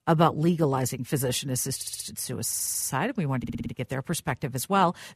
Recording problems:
audio stuttering; at 2 s, at 2.5 s and at 3.5 s

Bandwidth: 14.5 kHz